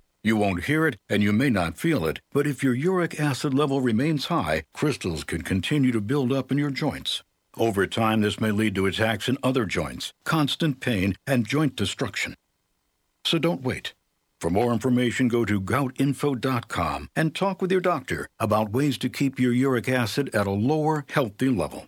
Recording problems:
none

